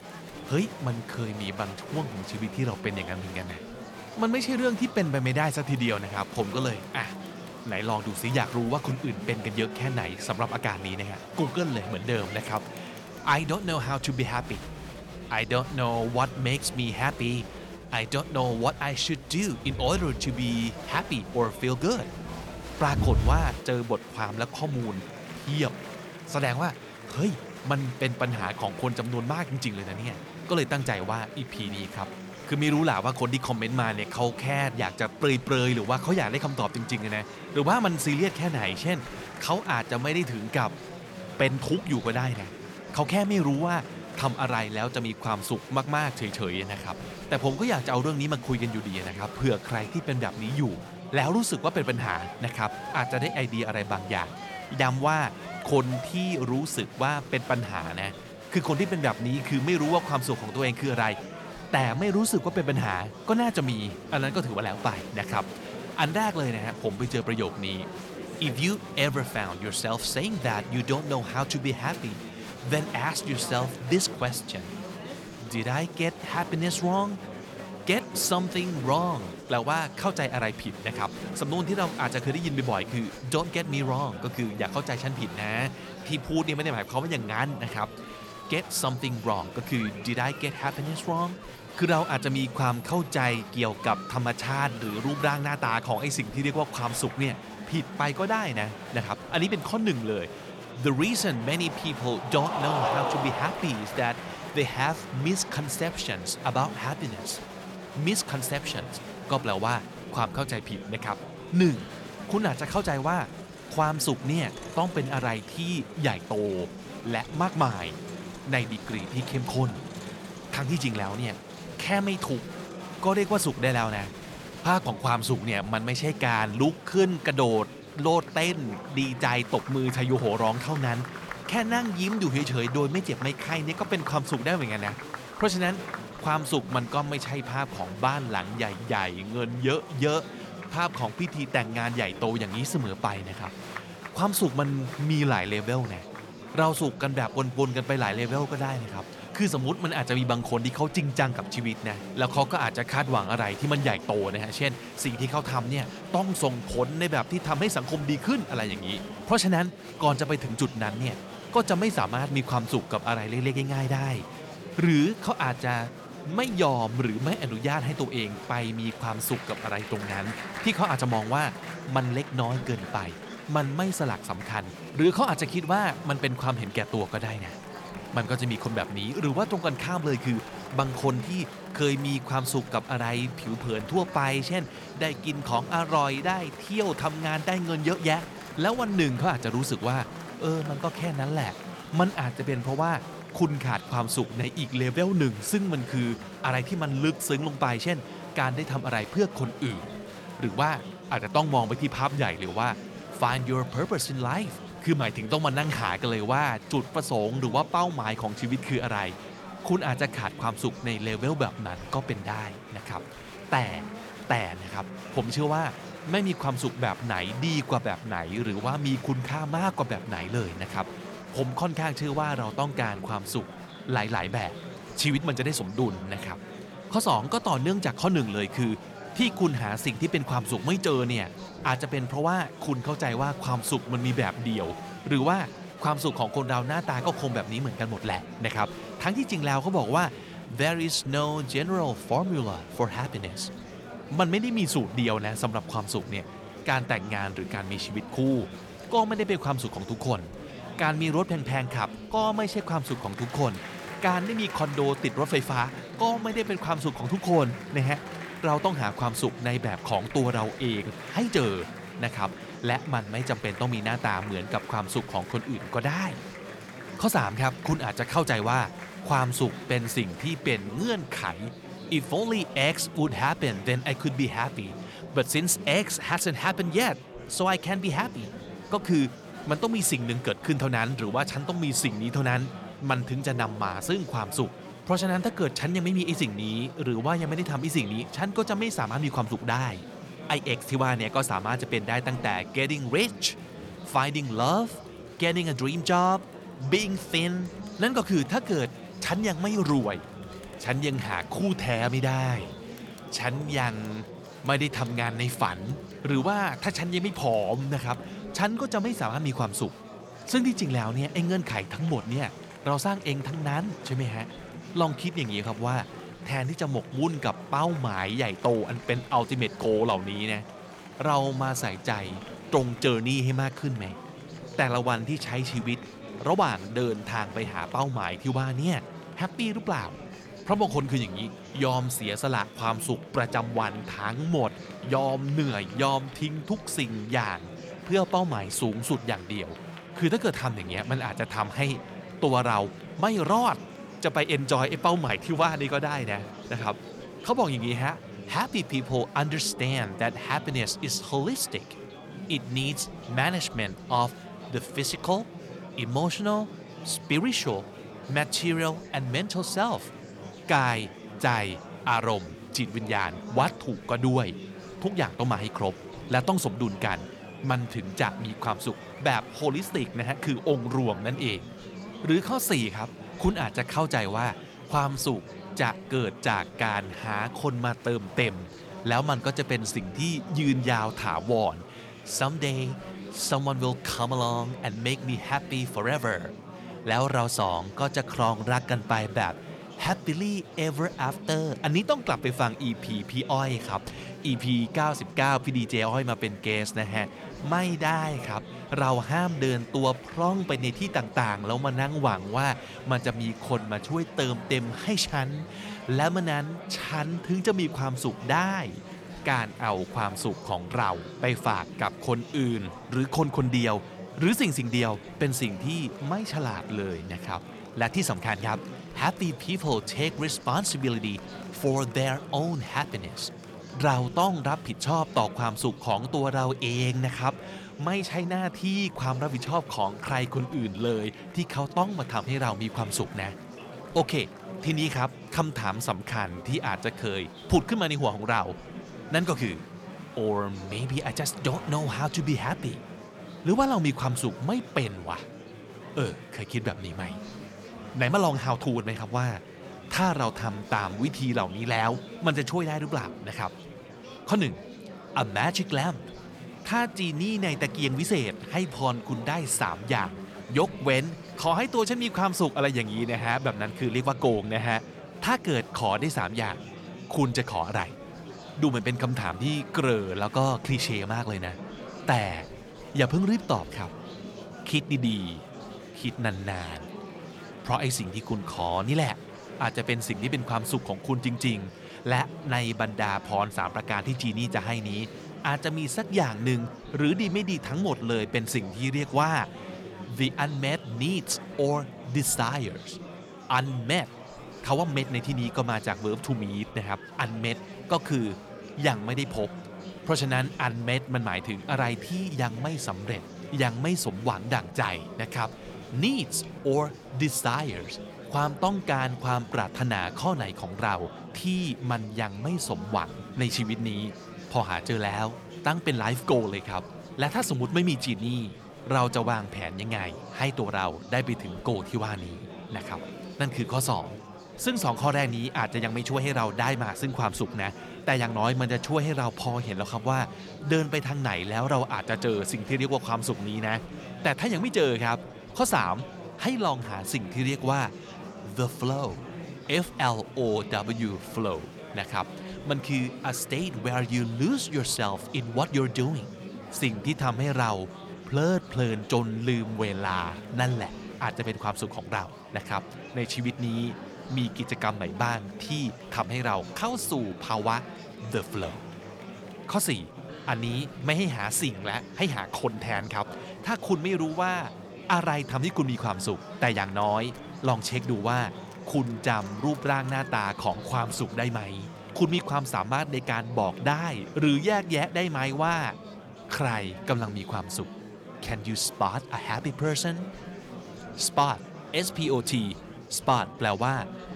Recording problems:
murmuring crowd; noticeable; throughout; 10 dB below the speech

